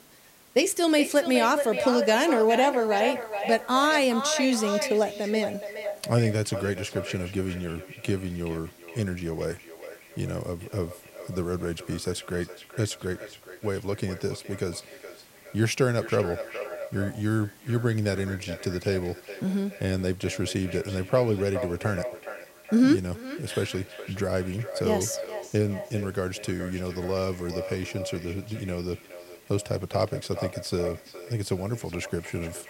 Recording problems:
echo of what is said; strong; throughout; 420 ms later, 9 dB below the speech
hiss; faint; throughout; 25 dB below the speech

